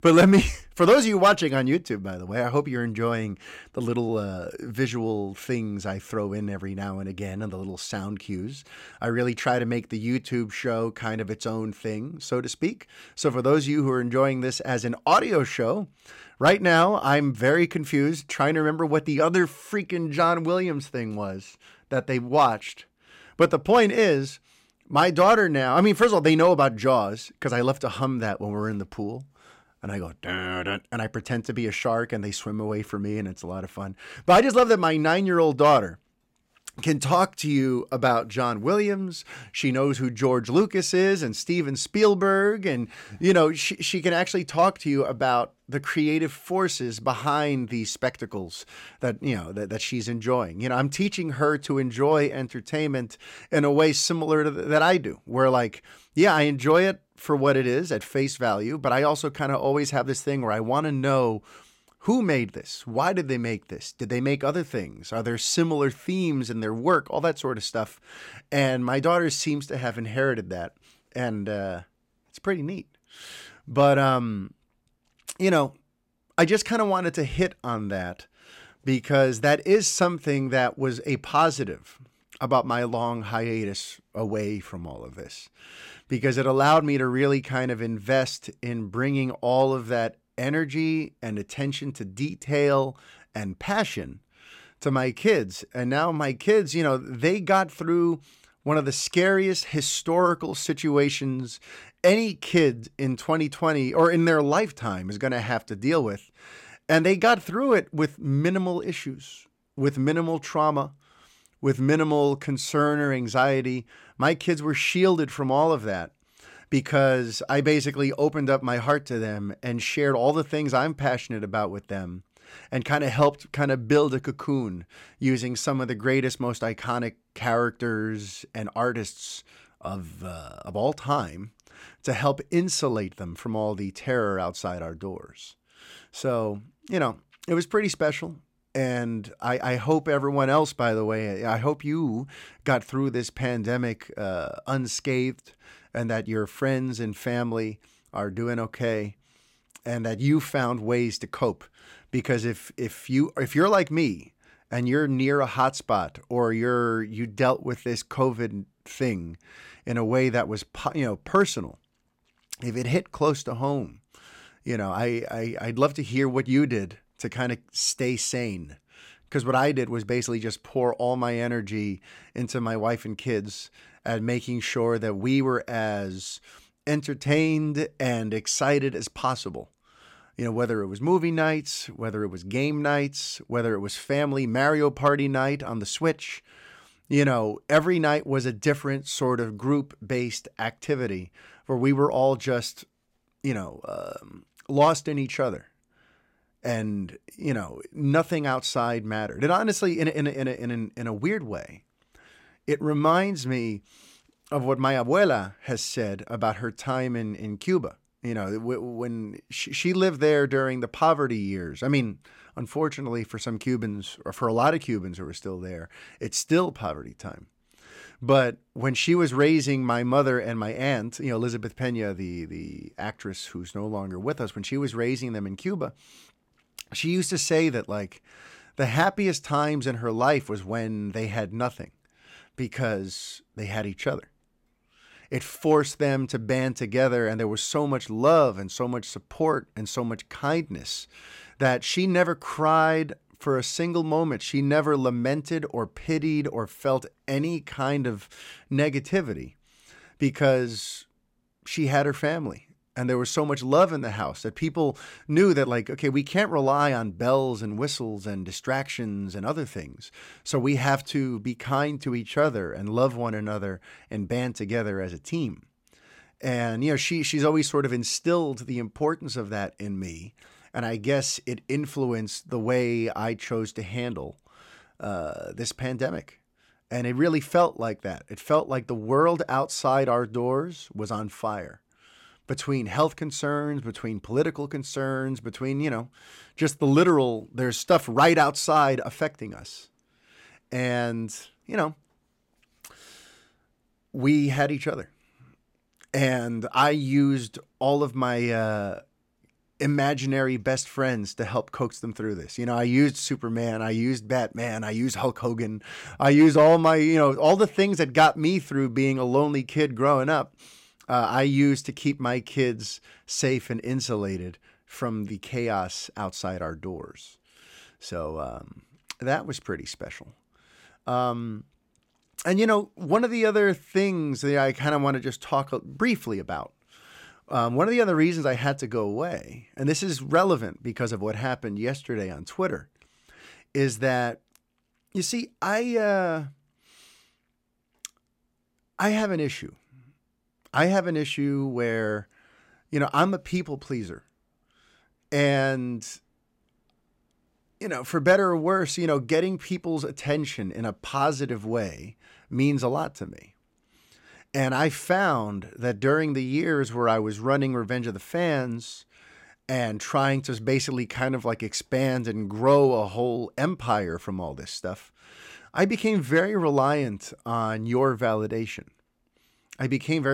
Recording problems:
abrupt cut into speech; at the end

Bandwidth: 16.5 kHz